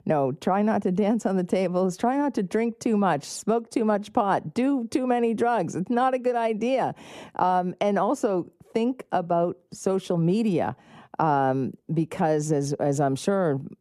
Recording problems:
muffled; slightly; fading above 1.5 kHz

